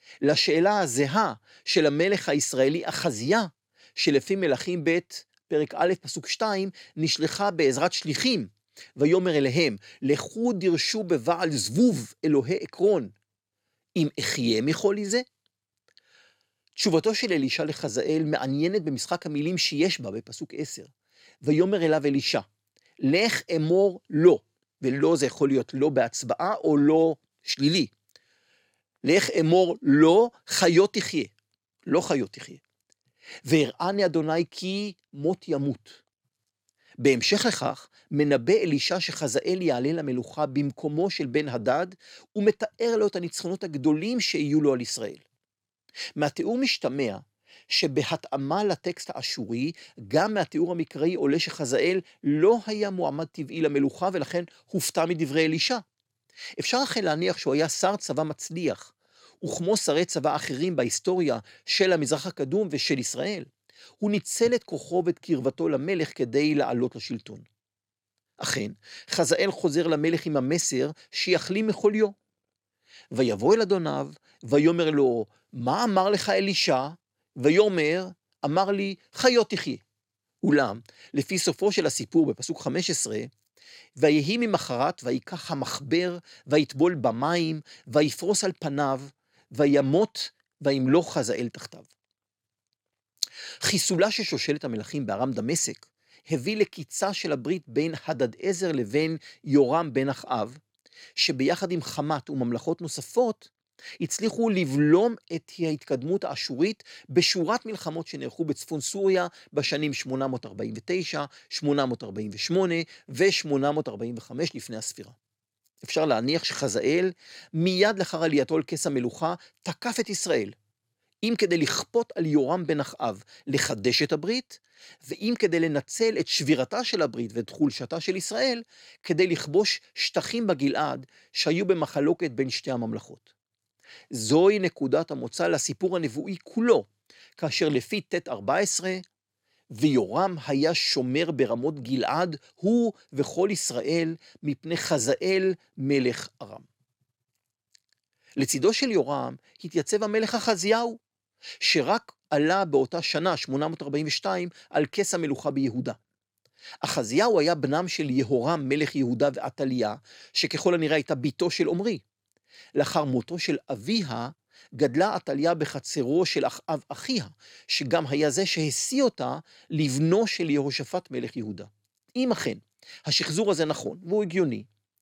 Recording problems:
none

